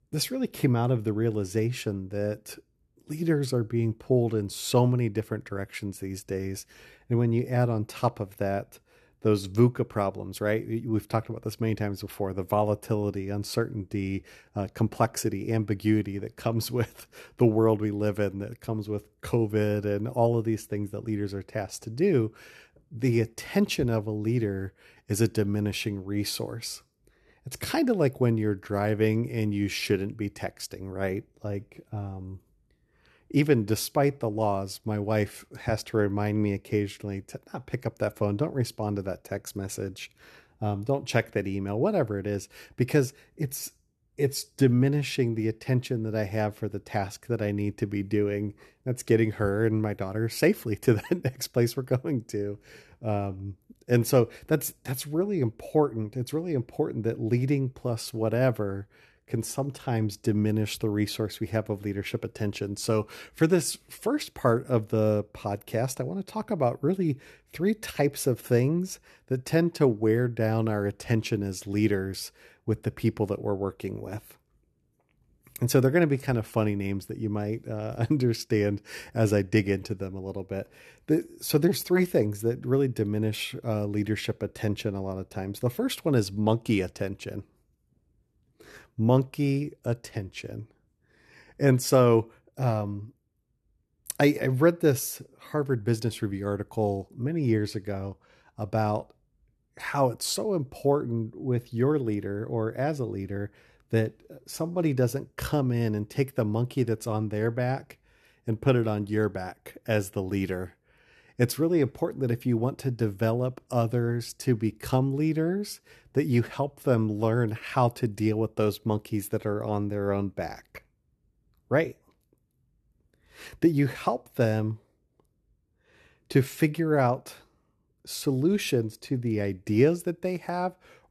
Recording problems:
none

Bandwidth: 13.5 kHz